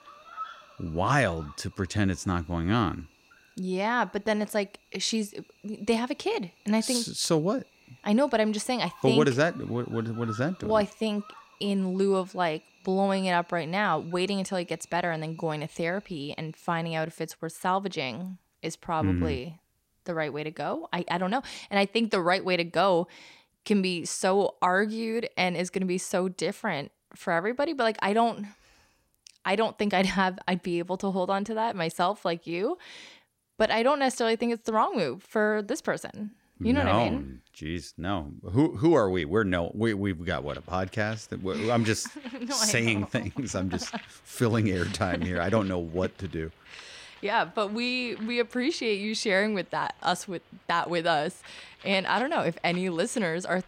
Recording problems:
animal sounds; faint; throughout; 25 dB below the speech

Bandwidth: 16 kHz